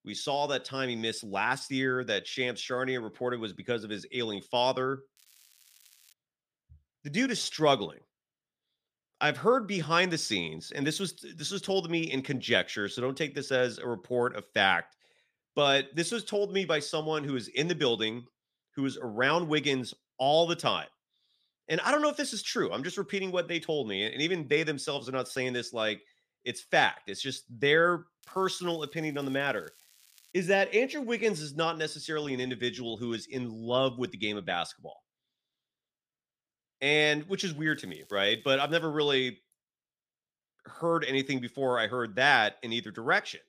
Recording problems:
crackling; faint; at 5 s, from 28 to 30 s and from 38 to 39 s; 30 dB below the speech

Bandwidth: 15 kHz